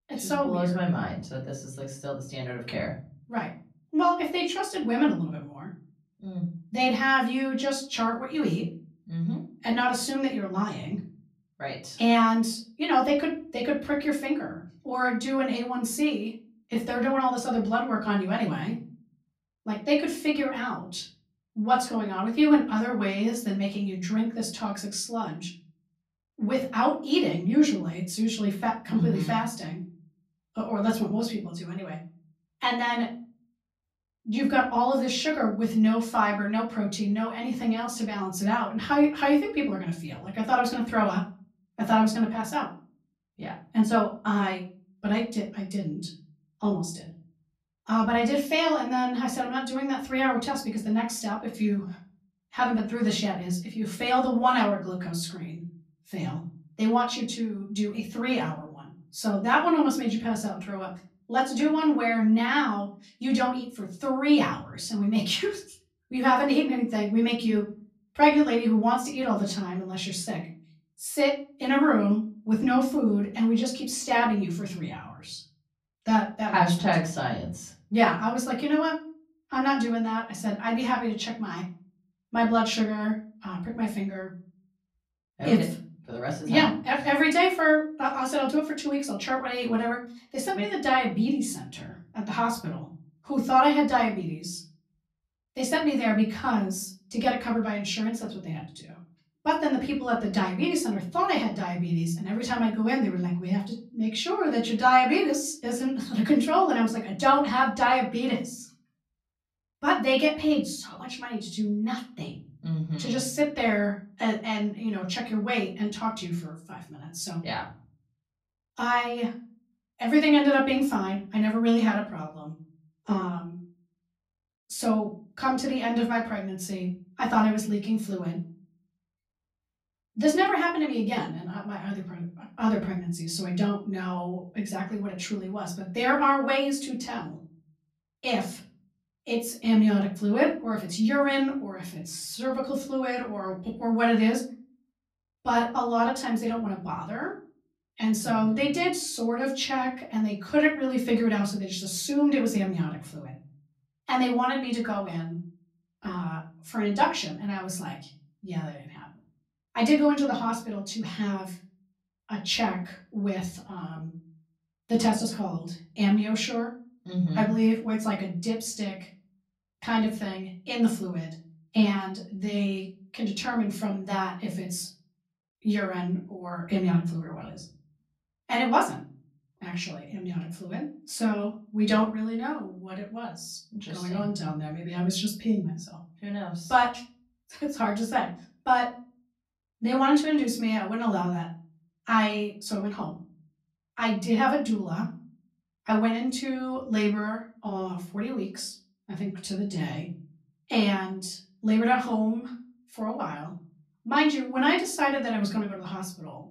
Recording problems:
off-mic speech; far
room echo; slight; dies away in 0.5 s

